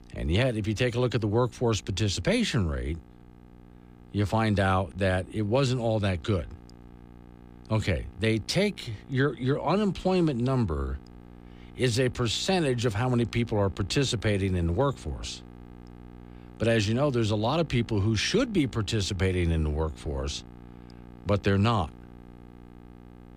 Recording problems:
electrical hum; faint; throughout; 60 Hz, 25 dB below the speech

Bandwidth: 15 kHz